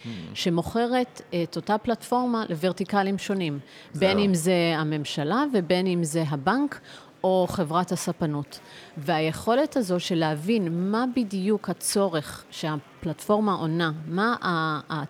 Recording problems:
murmuring crowd; faint; throughout; 25 dB below the speech

